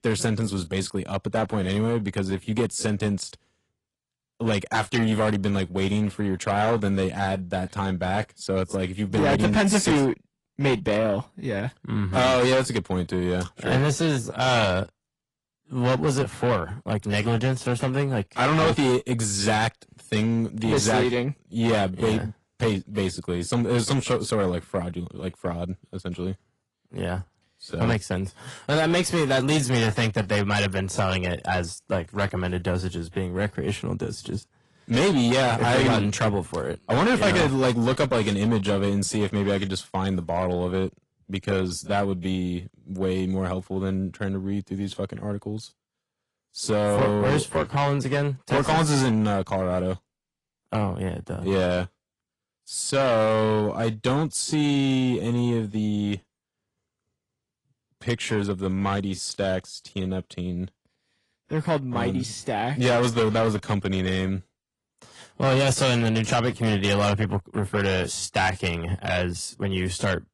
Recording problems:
distortion; heavy; 8 dB below the speech
garbled, watery; slightly; nothing above 10.5 kHz

